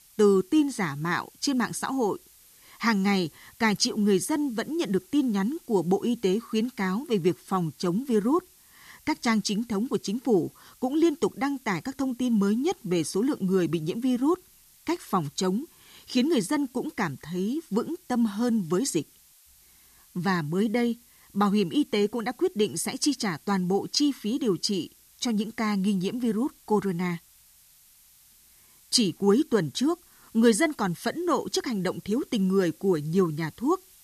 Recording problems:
hiss; faint; throughout; 25 dB below the speech

